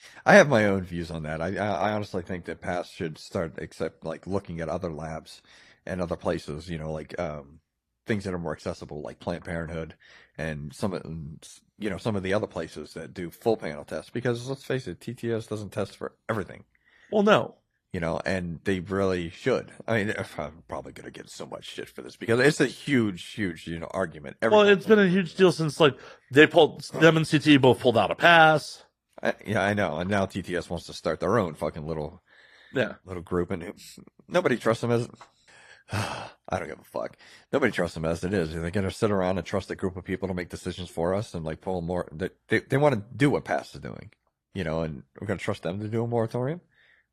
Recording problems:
garbled, watery; slightly; nothing above 14.5 kHz

